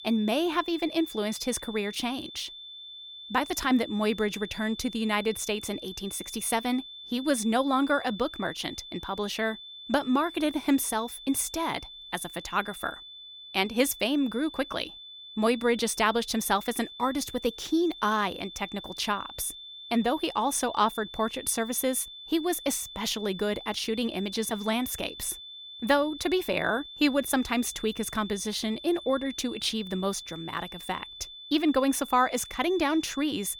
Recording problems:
high-pitched whine; noticeable; throughout; 3.5 kHz, 15 dB below the speech

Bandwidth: 18 kHz